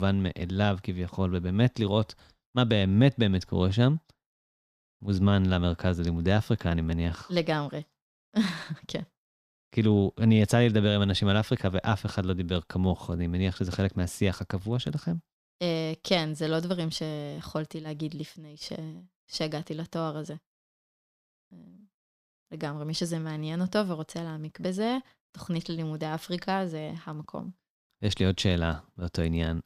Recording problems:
abrupt cut into speech; at the start

